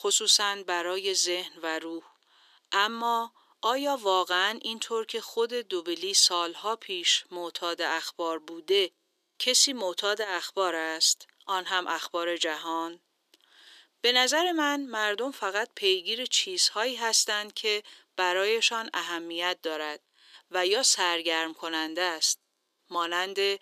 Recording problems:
thin; very; fading below 350 Hz

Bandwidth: 14.5 kHz